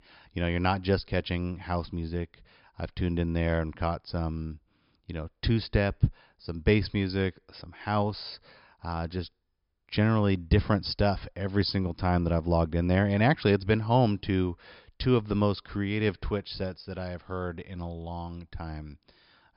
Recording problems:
high frequencies cut off; noticeable; nothing above 5.5 kHz

